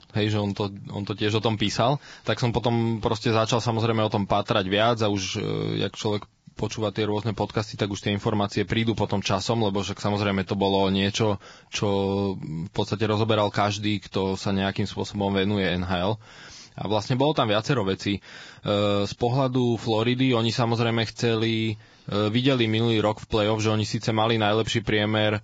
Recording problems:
garbled, watery; badly; nothing above 7.5 kHz

